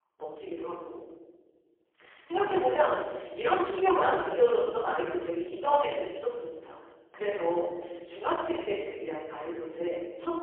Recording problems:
phone-call audio; poor line; nothing above 3 kHz
off-mic speech; far
thin; very; fading below 350 Hz
room echo; noticeable; dies away in 1.2 s

